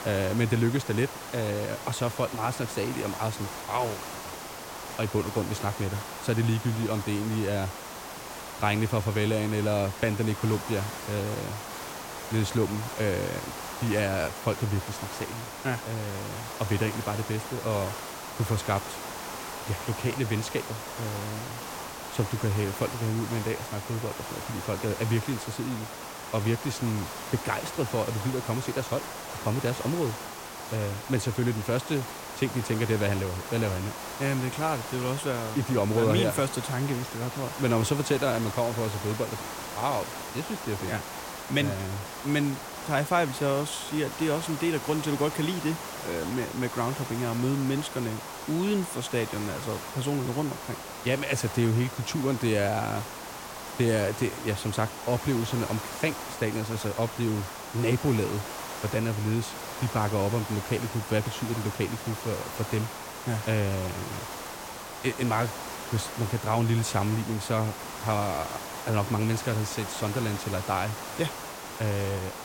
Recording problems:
hiss; loud; throughout; 7 dB below the speech

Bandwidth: 16.5 kHz